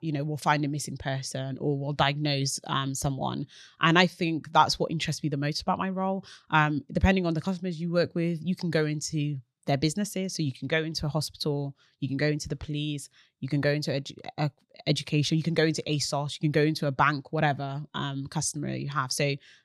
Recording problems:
none

